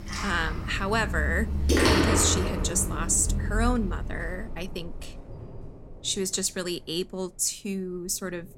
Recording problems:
rain or running water; very loud; throughout; as loud as the speech

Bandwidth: 16 kHz